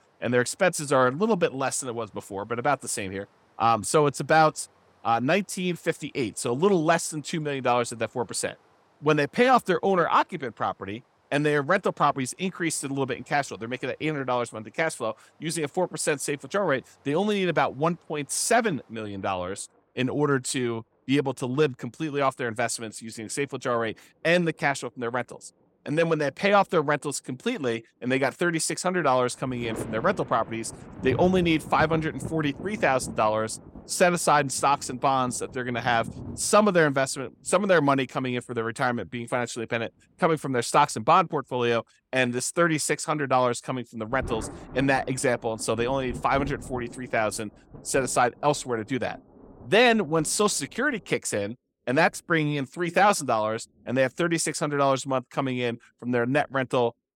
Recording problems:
rain or running water; noticeable; throughout; 15 dB below the speech

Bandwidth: 17 kHz